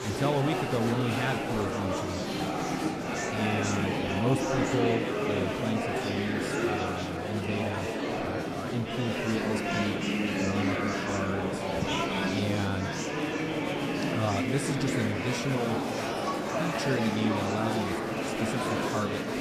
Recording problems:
murmuring crowd; very loud; throughout; 3 dB above the speech

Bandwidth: 14.5 kHz